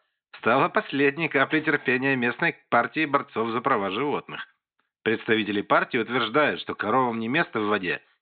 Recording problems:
high frequencies cut off; severe; nothing above 4 kHz

